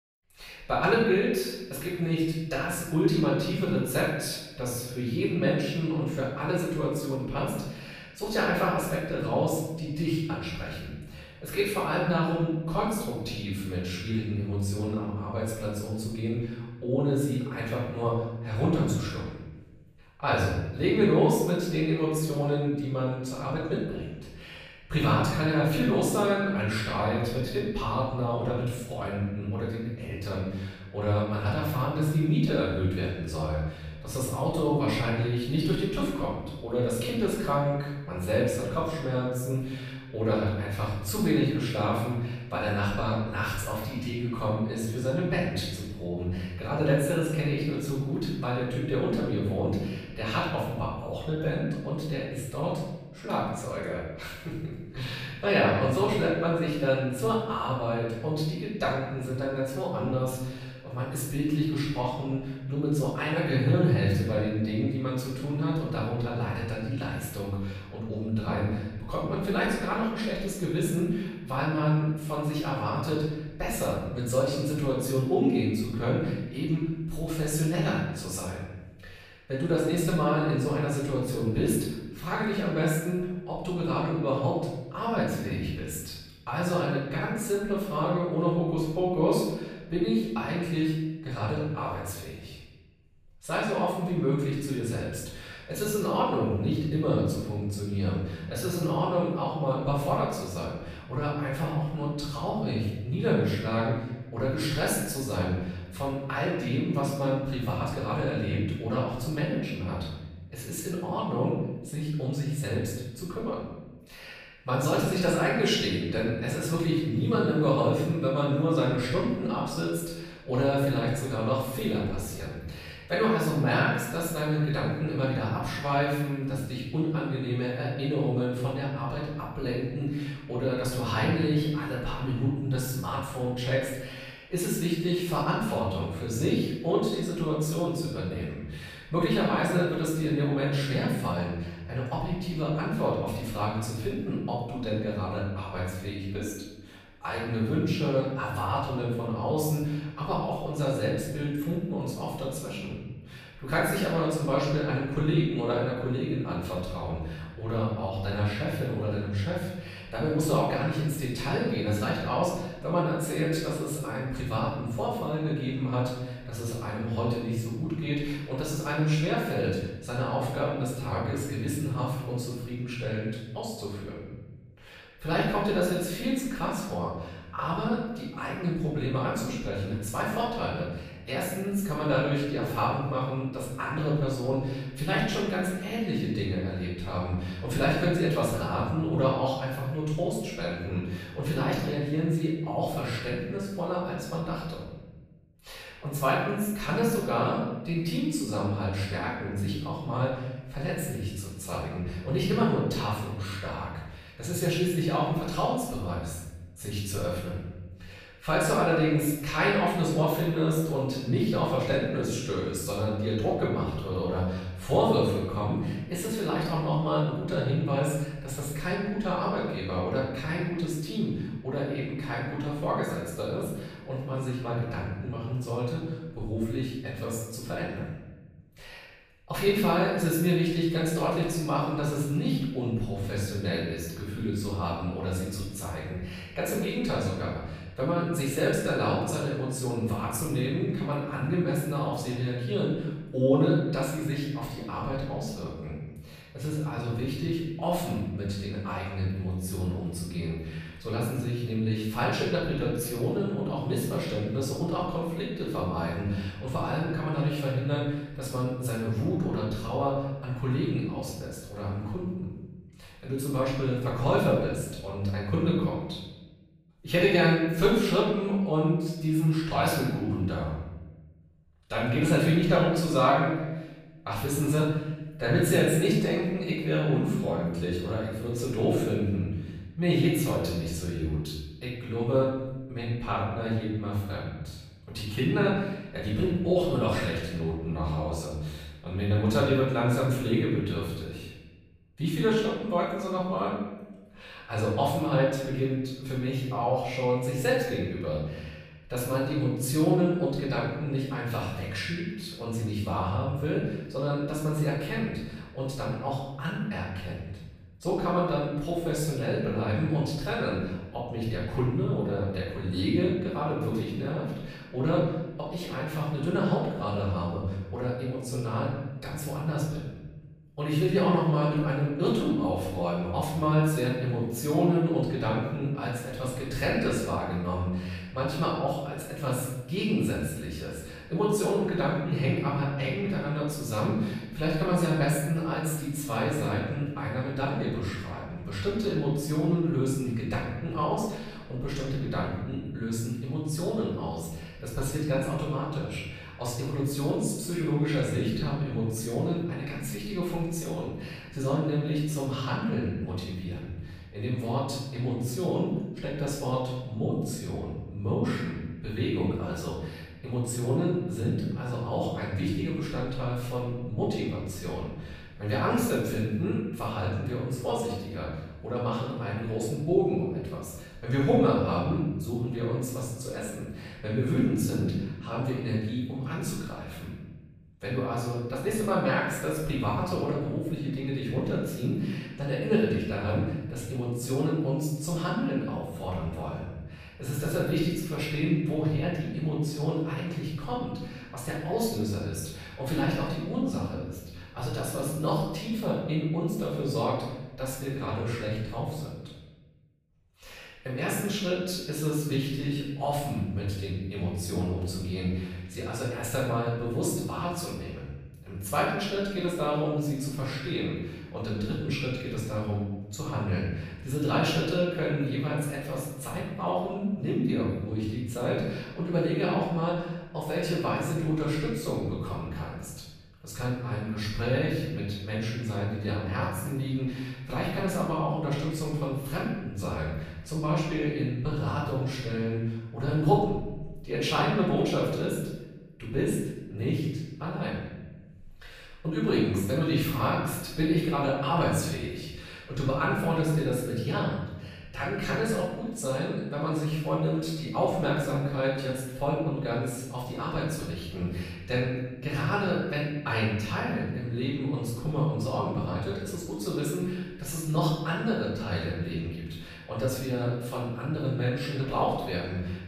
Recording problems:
off-mic speech; far
room echo; noticeable; dies away in 1.1 s

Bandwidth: 14.5 kHz